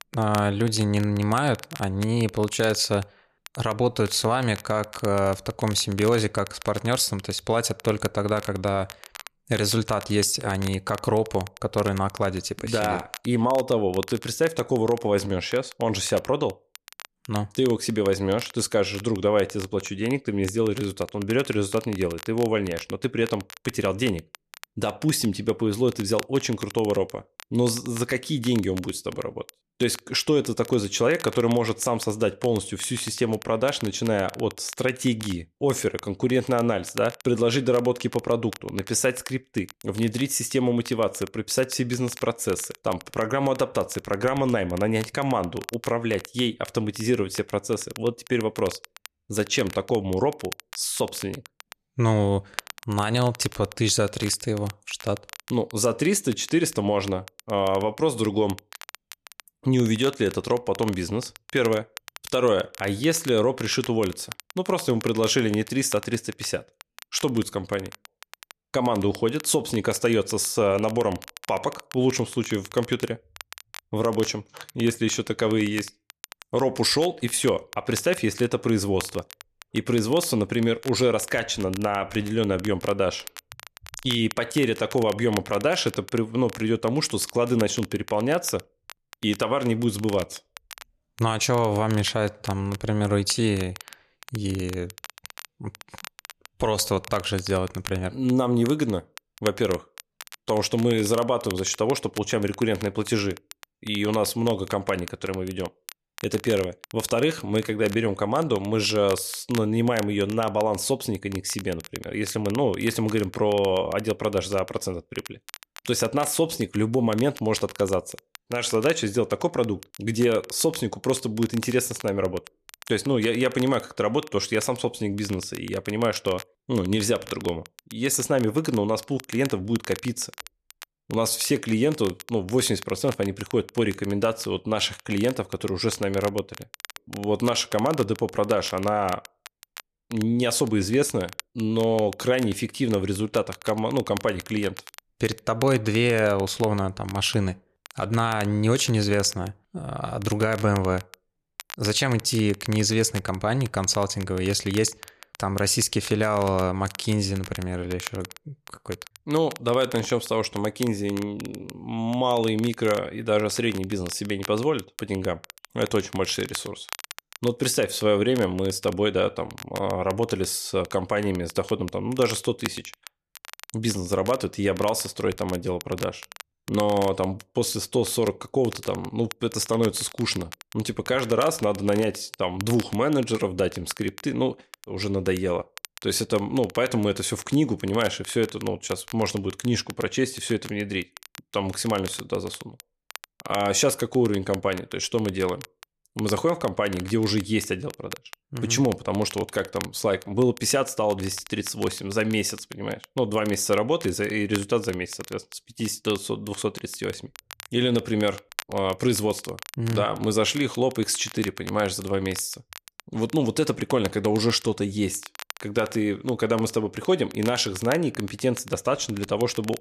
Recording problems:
crackle, like an old record; noticeable; 15 dB below the speech

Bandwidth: 14 kHz